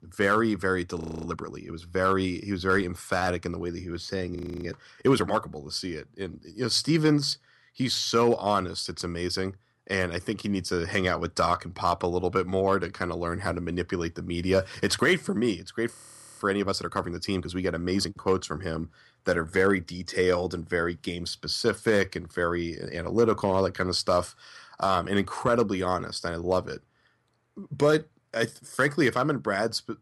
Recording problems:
audio freezing; at 1 s, at 4.5 s and at 16 s

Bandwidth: 15 kHz